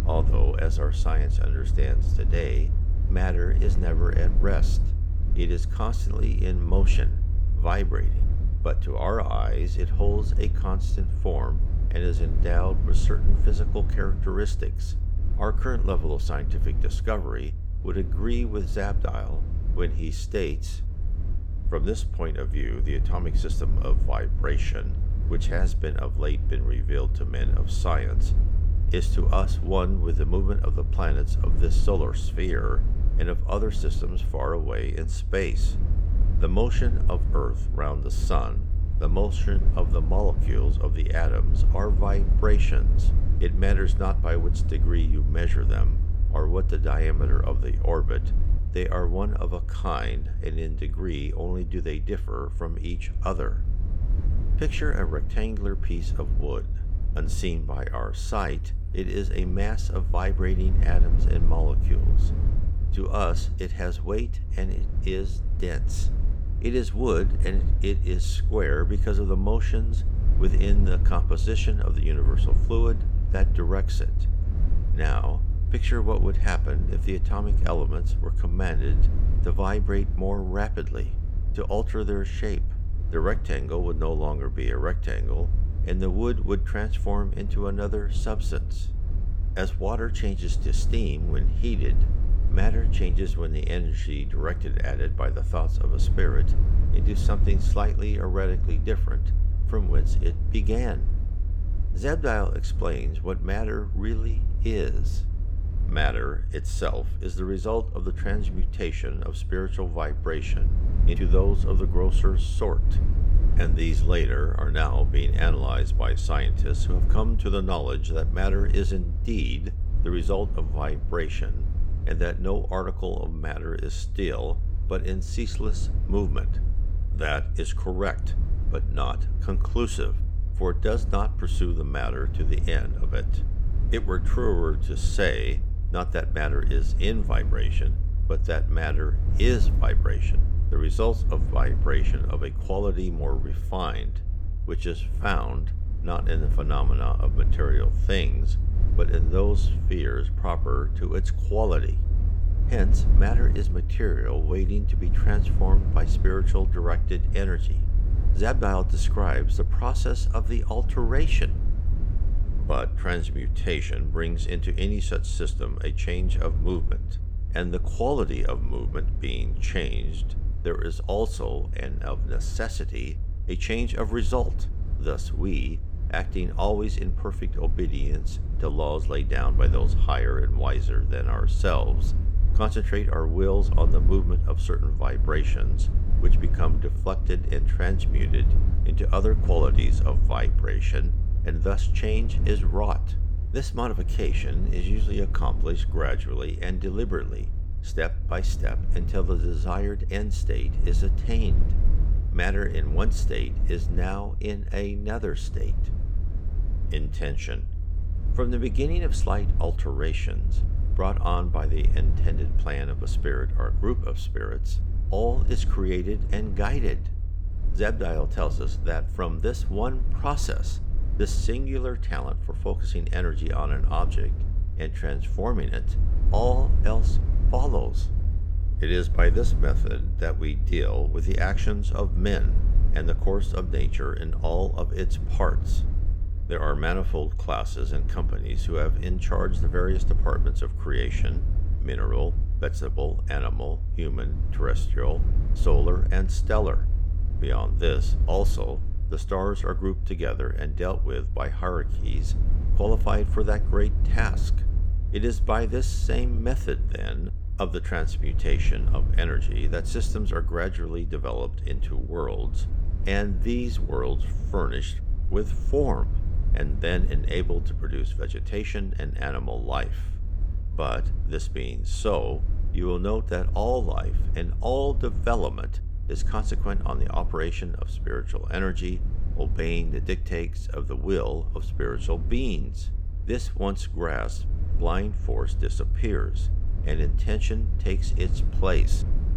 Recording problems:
low rumble; noticeable; throughout; 10 dB below the speech

